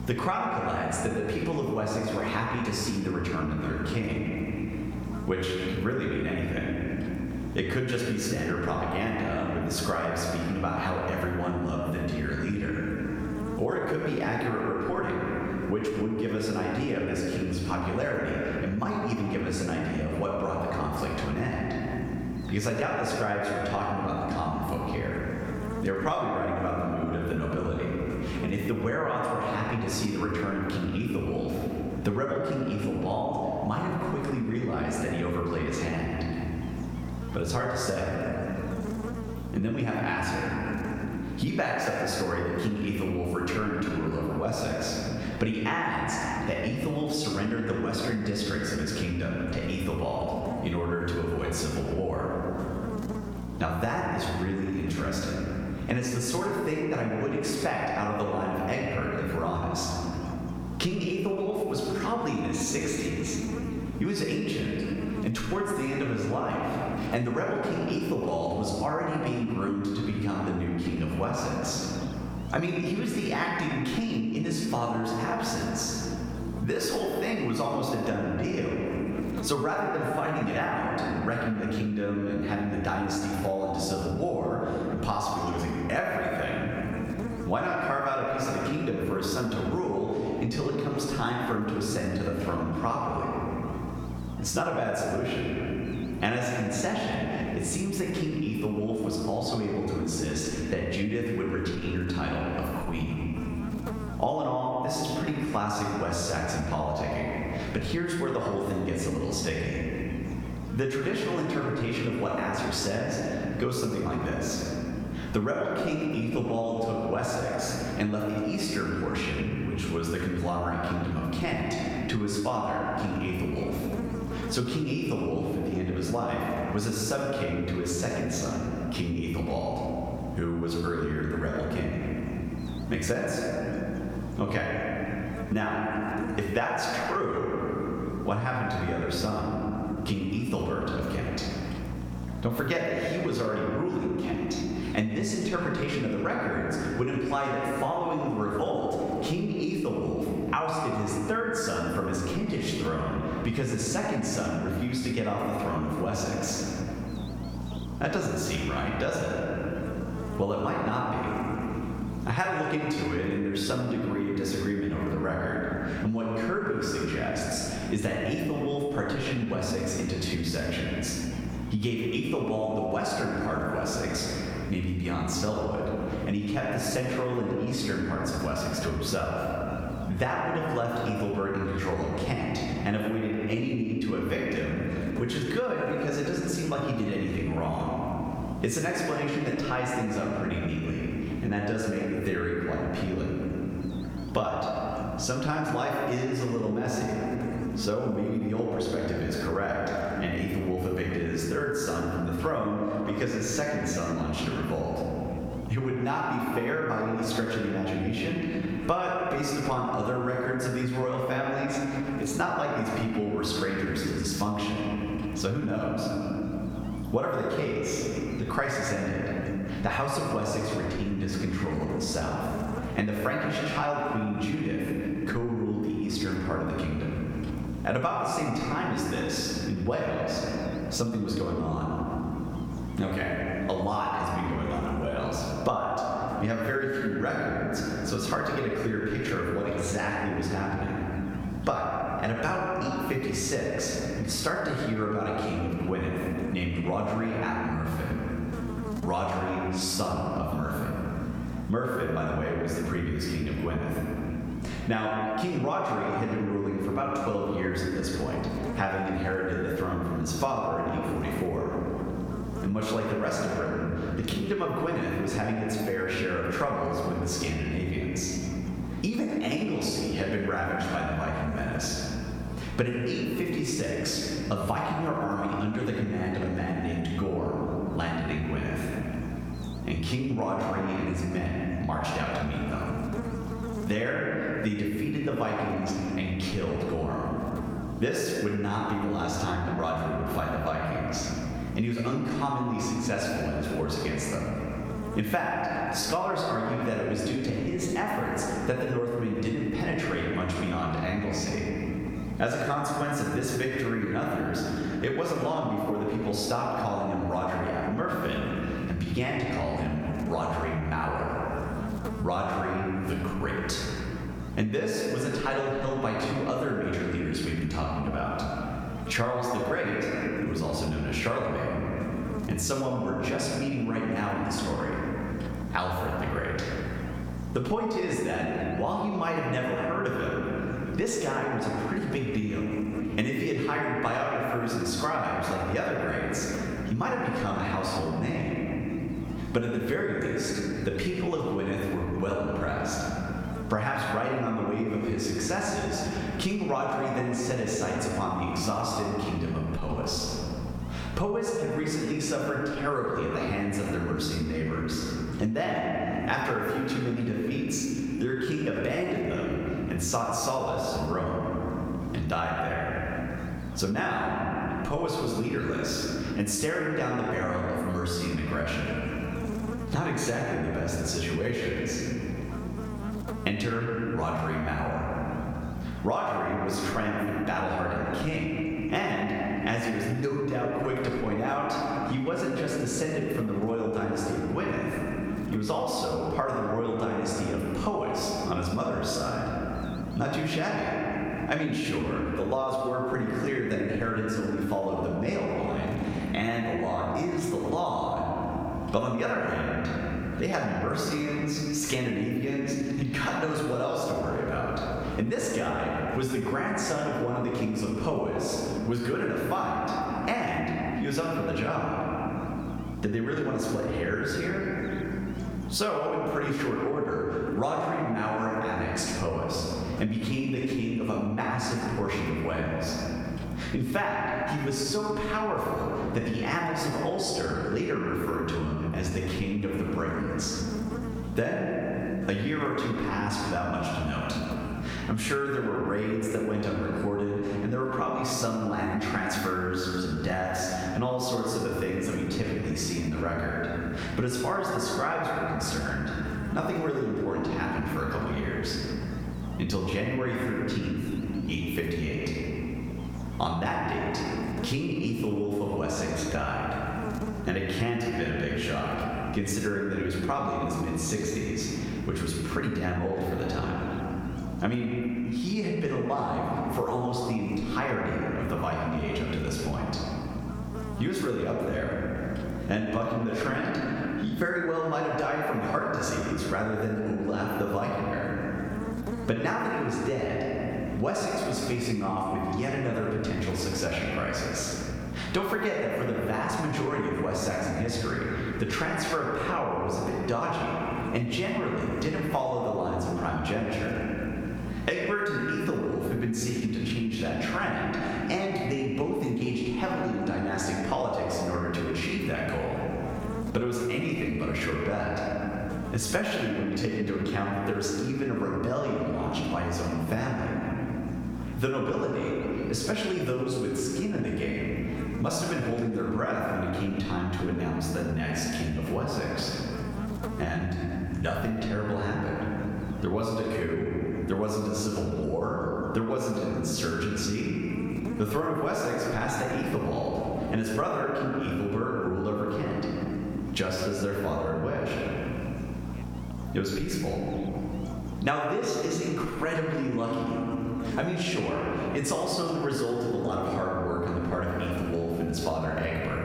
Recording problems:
off-mic speech; far
room echo; noticeable; dies away in 1.8 s
squashed, flat; somewhat
electrical hum; noticeable; throughout; 60 Hz, 20 dB below the speech

